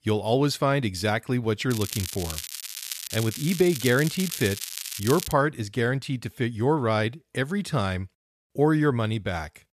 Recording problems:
crackling; loud; from 1.5 to 5.5 s; 7 dB below the speech

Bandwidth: 14.5 kHz